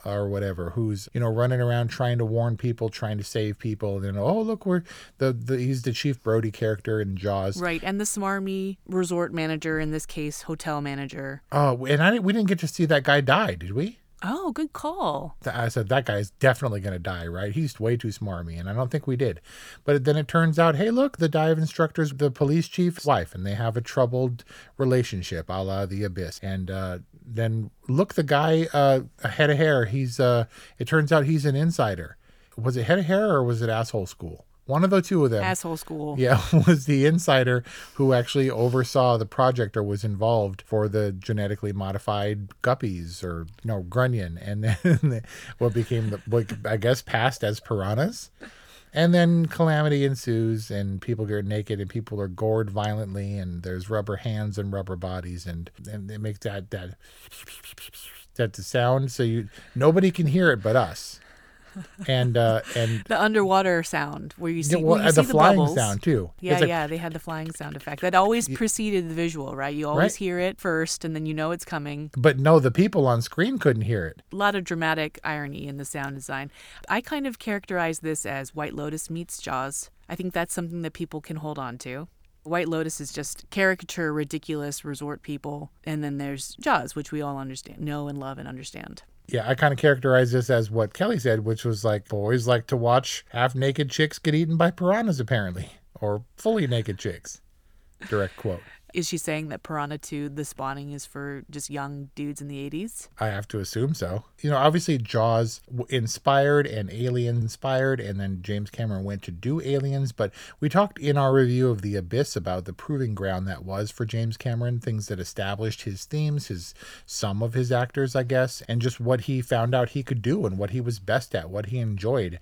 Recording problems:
none

